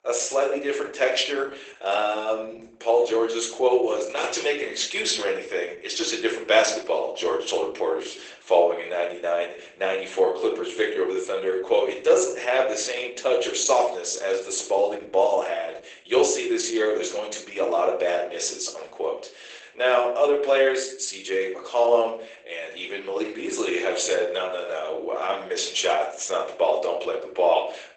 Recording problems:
garbled, watery; badly; nothing above 8 kHz
thin; very; fading below 350 Hz
room echo; slight; dies away in 0.4 s
off-mic speech; somewhat distant

